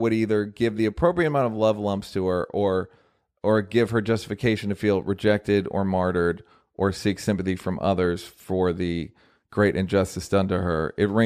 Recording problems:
abrupt cut into speech; at the start and the end

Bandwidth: 14.5 kHz